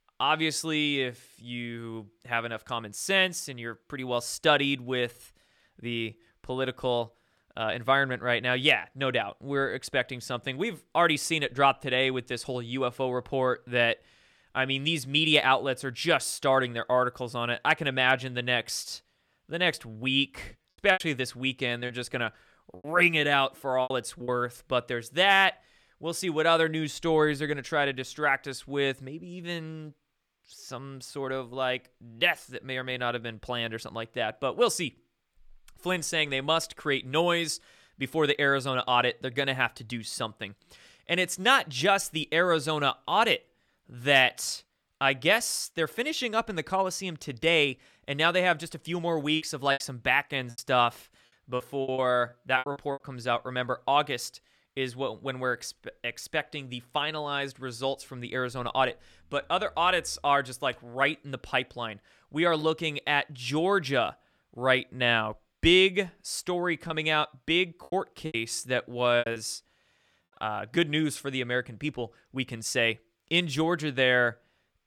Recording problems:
choppy; very; from 21 to 24 s, from 49 to 53 s and from 1:07 to 1:09; 13% of the speech affected

